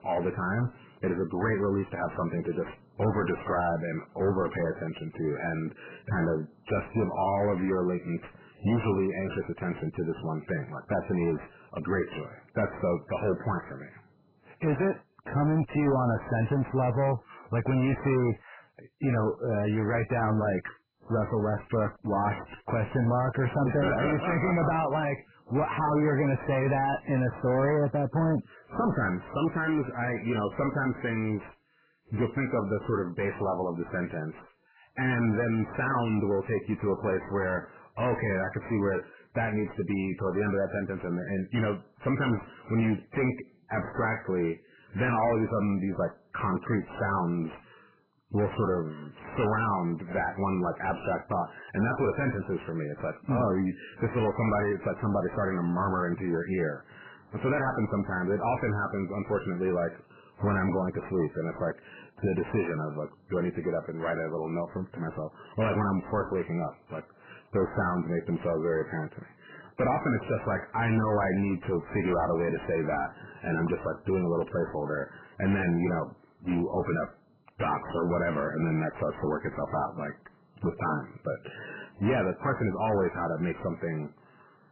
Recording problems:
distortion; heavy; 5 dB below the speech
garbled, watery; badly; nothing above 2.5 kHz

